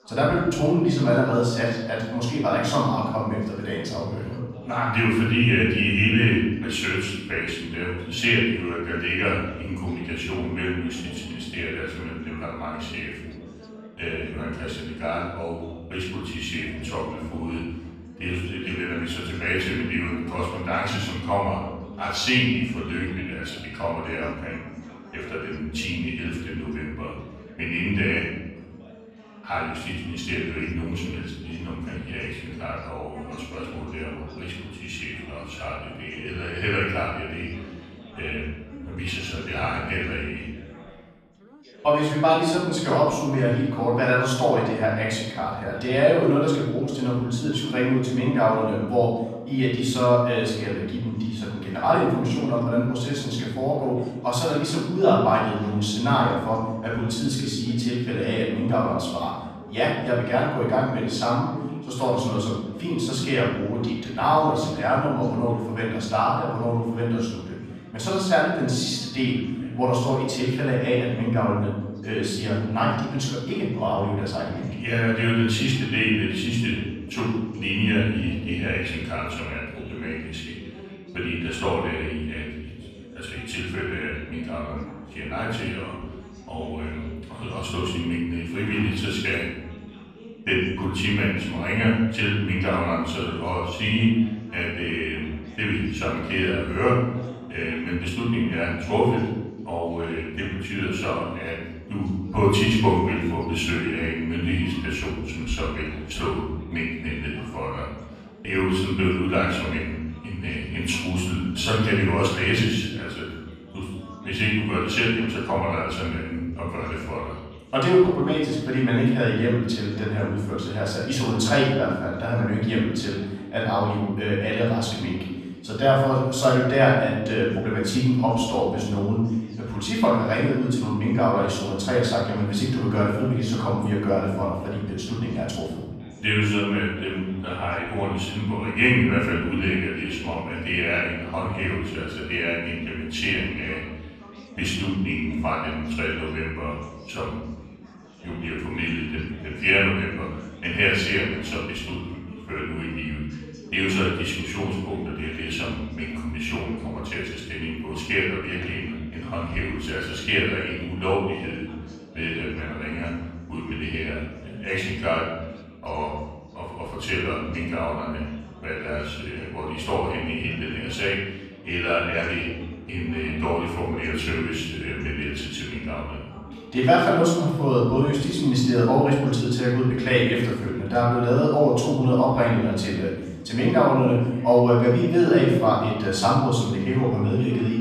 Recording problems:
off-mic speech; far
room echo; noticeable; dies away in 1 s
background chatter; faint; throughout; 3 voices, 20 dB below the speech

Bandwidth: 14 kHz